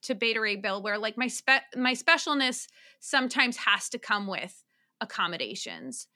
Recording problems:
none

